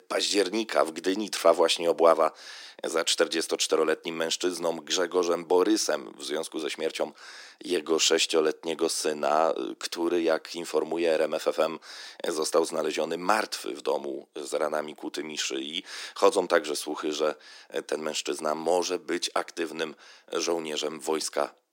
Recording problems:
thin; very; fading below 300 Hz

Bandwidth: 16 kHz